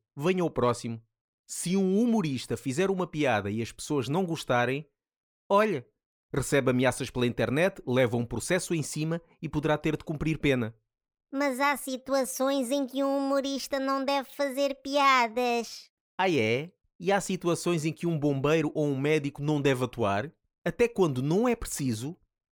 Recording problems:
none

